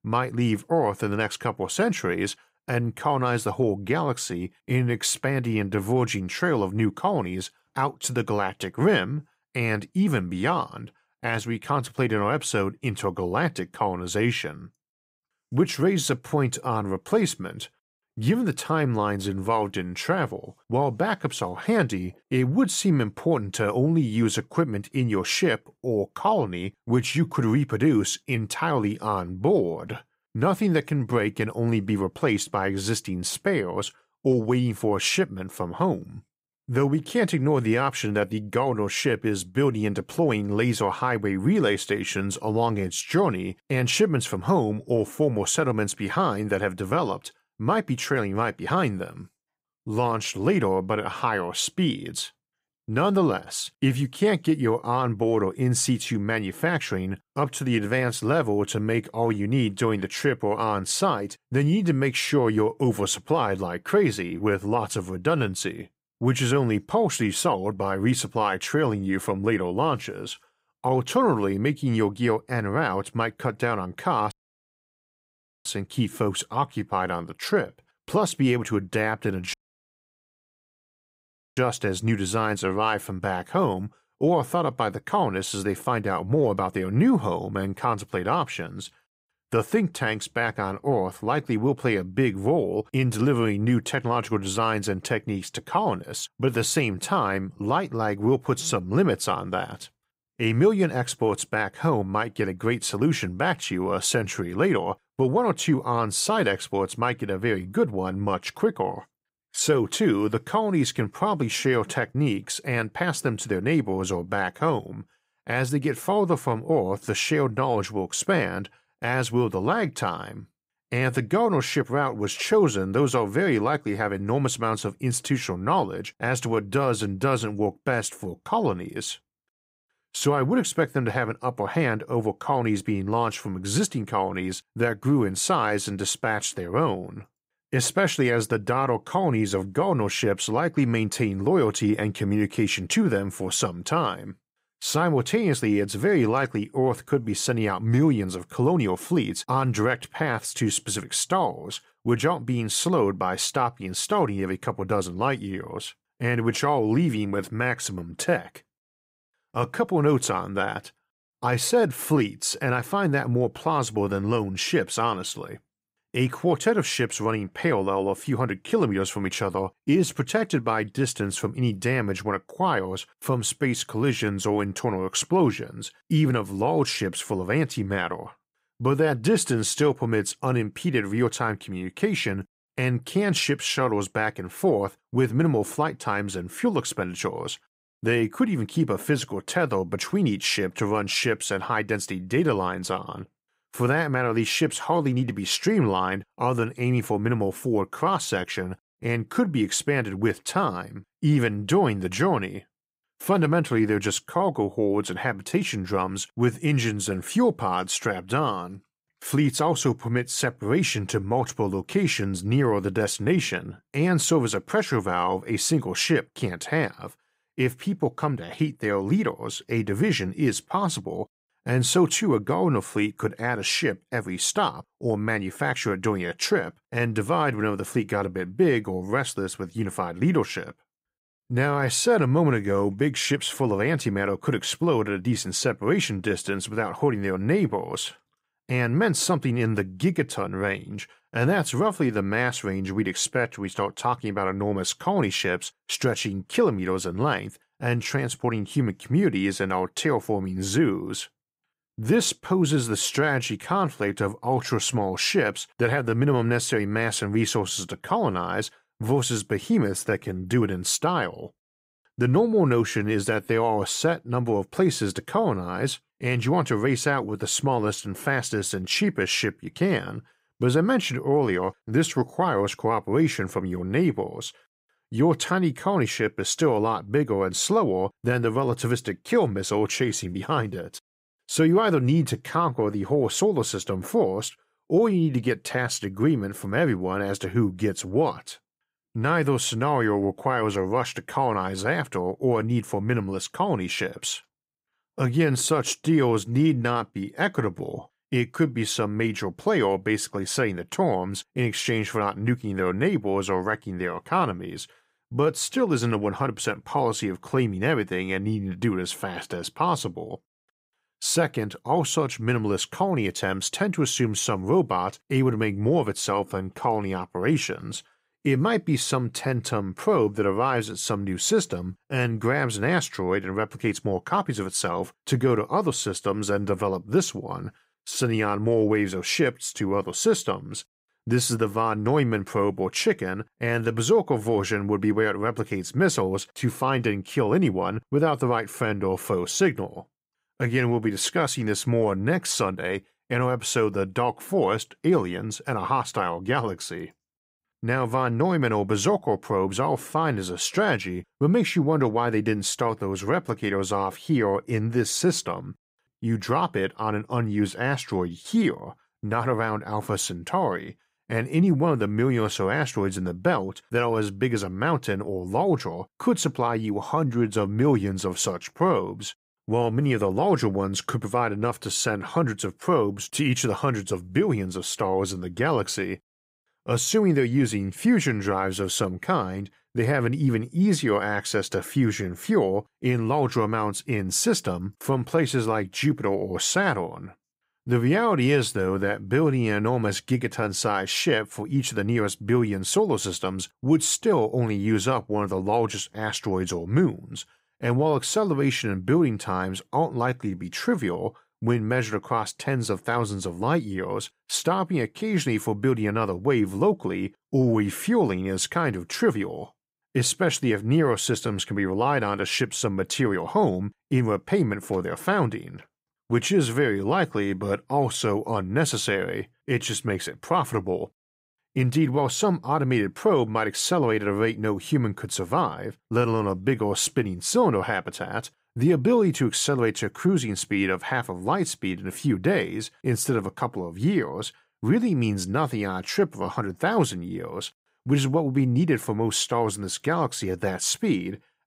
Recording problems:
audio cutting out; at 1:14 for 1.5 s and at 1:20 for 2 s

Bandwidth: 15.5 kHz